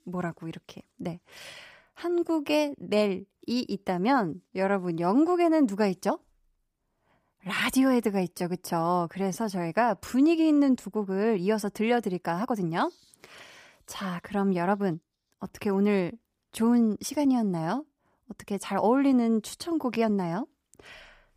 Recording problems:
uneven, jittery; strongly; from 1 to 20 s

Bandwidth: 15 kHz